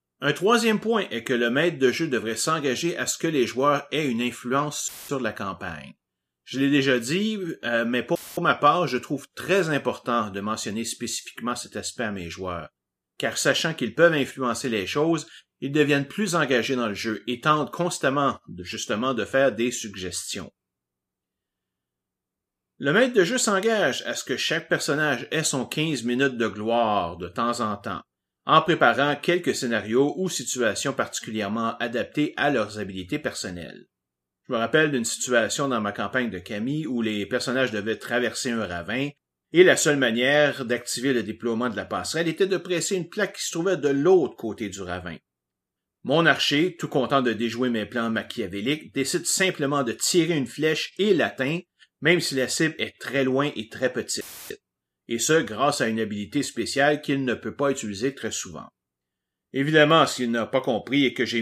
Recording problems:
audio cutting out; filled with static; at 5 s, at 8 s and at 54 s
abrupt cut into speech; at the end

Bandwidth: 14.5 kHz